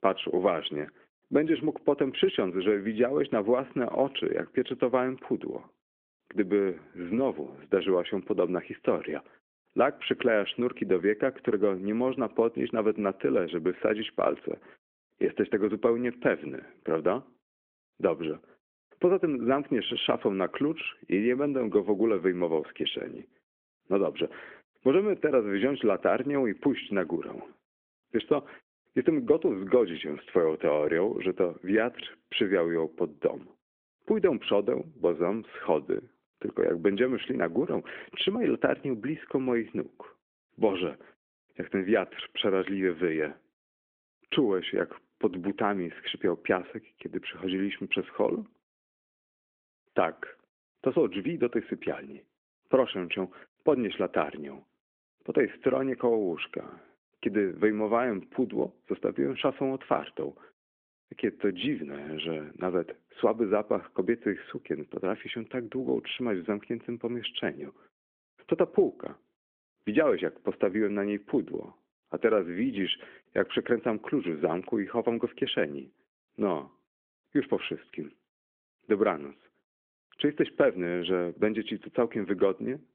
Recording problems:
phone-call audio; nothing above 3.5 kHz

